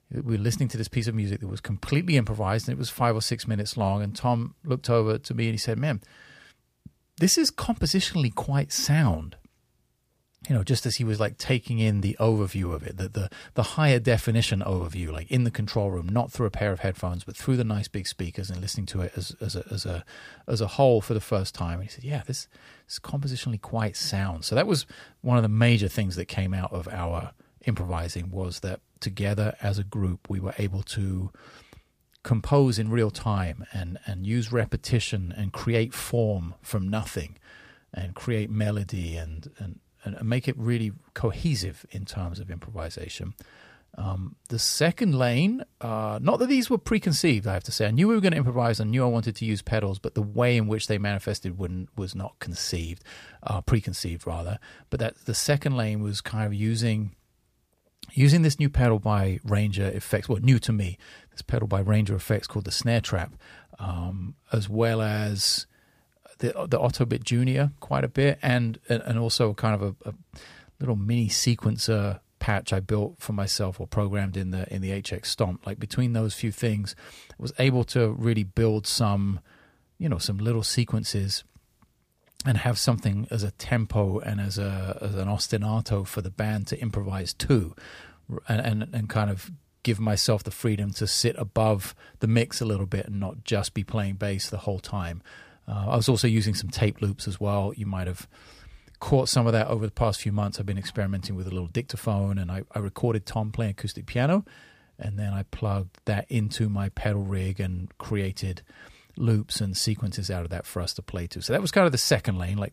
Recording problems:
none

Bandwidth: 15 kHz